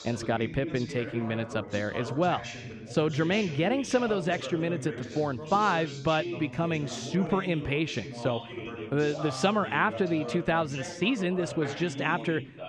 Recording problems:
background chatter; loud; throughout; 2 voices, 9 dB below the speech

